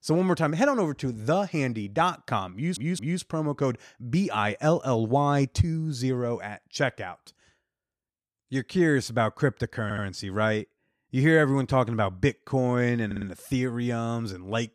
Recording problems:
audio stuttering; at 2.5 s, at 10 s and at 13 s

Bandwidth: 14.5 kHz